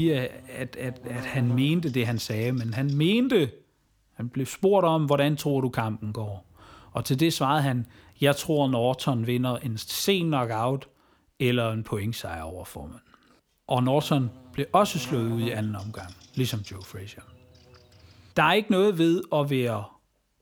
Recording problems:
electrical hum; faint; until 3.5 s, from 6 to 11 s and from 14 to 18 s; 60 Hz, 20 dB below the speech
abrupt cut into speech; at the start

